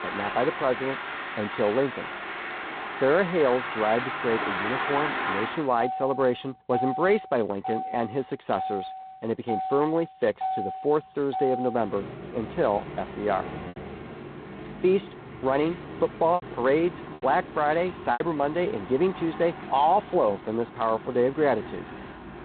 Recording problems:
phone-call audio; poor line; nothing above 4 kHz
traffic noise; loud; throughout; 8 dB below the speech
choppy; occasionally; from 16 to 18 s; 3% of the speech affected

